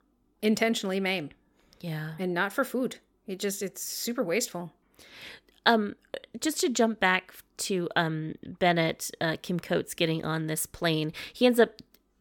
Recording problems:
none

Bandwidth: 17 kHz